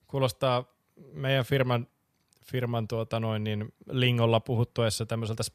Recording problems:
none

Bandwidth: 14.5 kHz